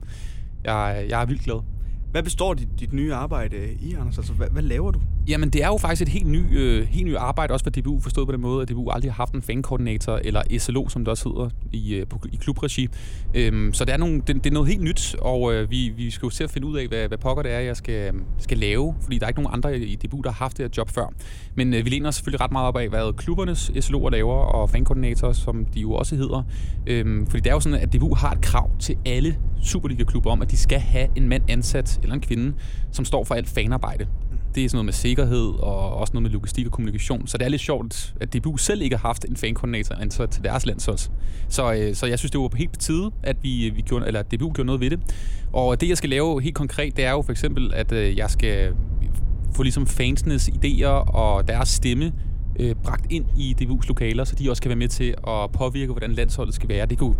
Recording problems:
low rumble; faint; throughout; 20 dB below the speech

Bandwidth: 16.5 kHz